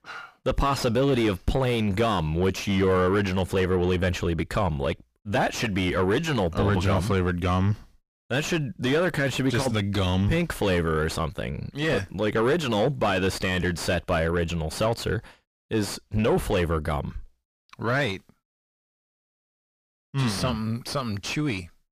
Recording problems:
distortion; heavy; 6 dB below the speech

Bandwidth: 15 kHz